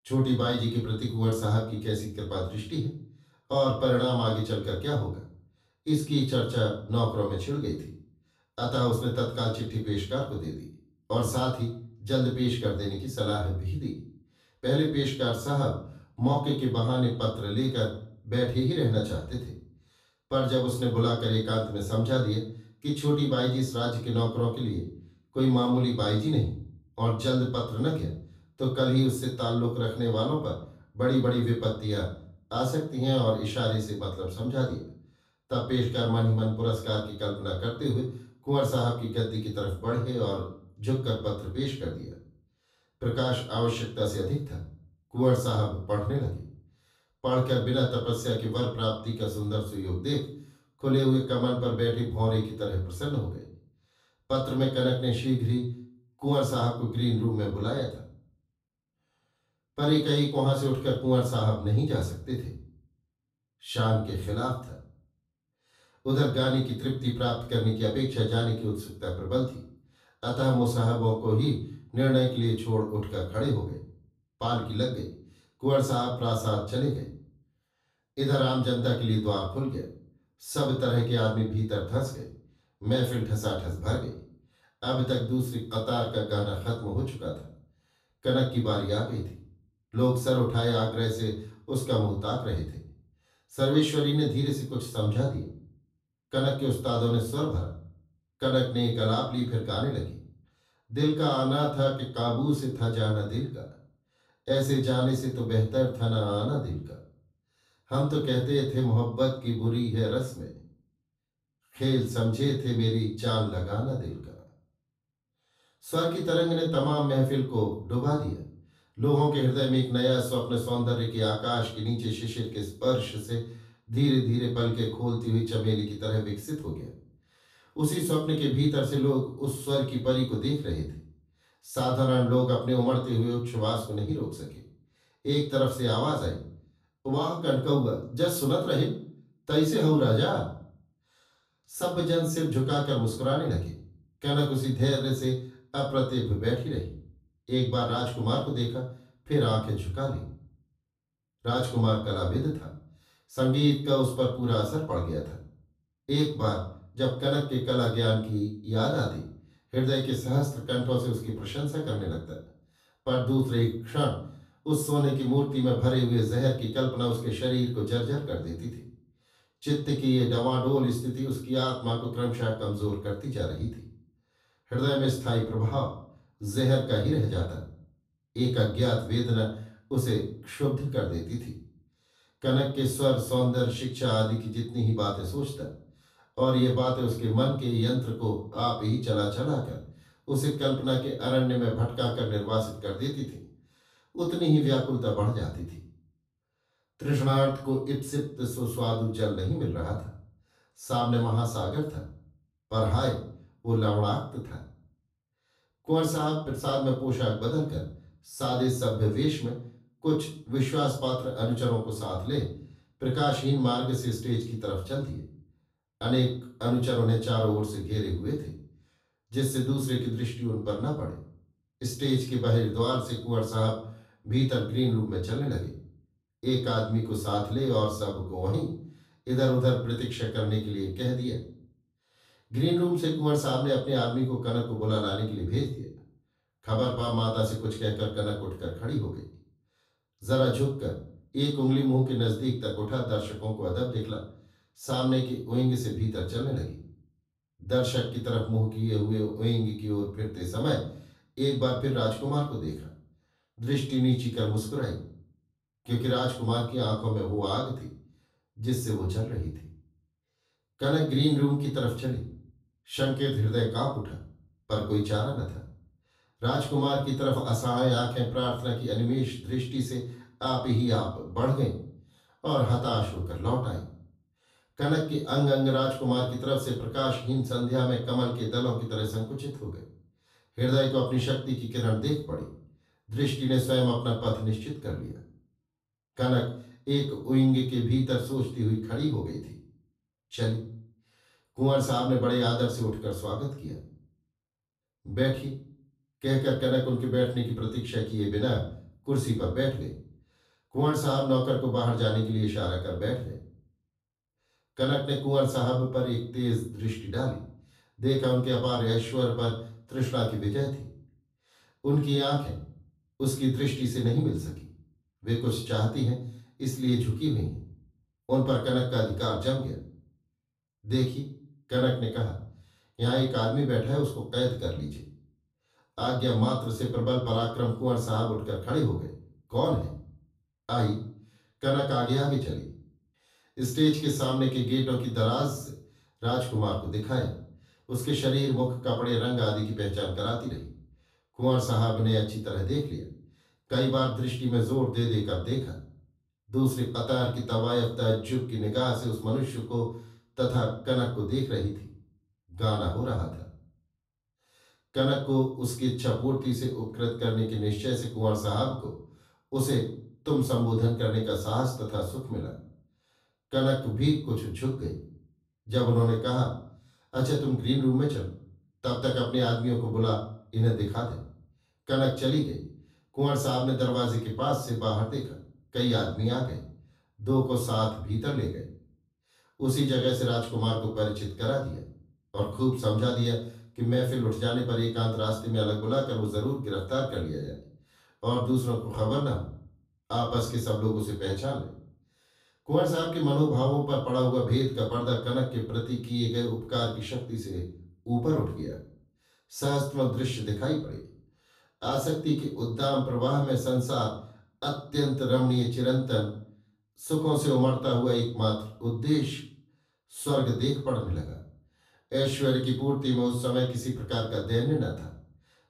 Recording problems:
off-mic speech; far
room echo; noticeable; dies away in 0.4 s

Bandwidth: 14.5 kHz